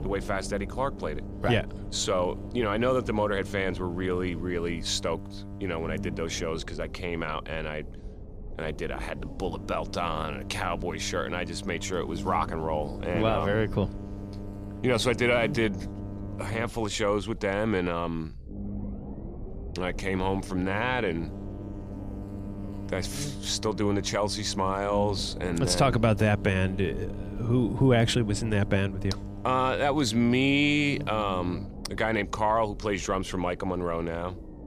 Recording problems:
electrical hum; noticeable; until 6.5 s, from 9.5 to 17 s and from 20 to 32 s; 50 Hz, 20 dB below the speech
low rumble; faint; throughout; 20 dB below the speech

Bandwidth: 15 kHz